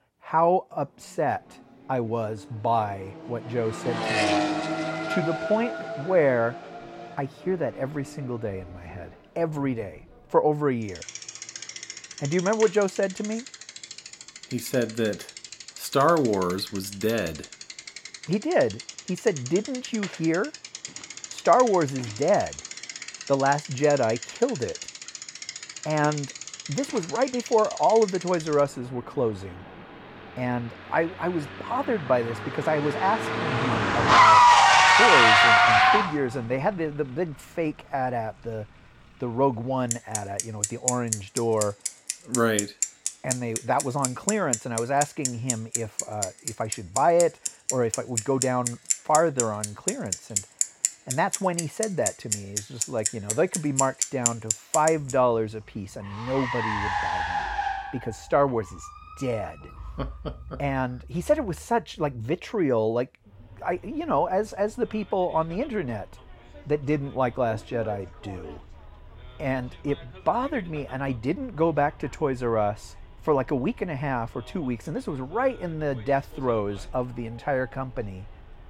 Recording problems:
traffic noise; very loud; throughout; 1 dB above the speech

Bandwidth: 16.5 kHz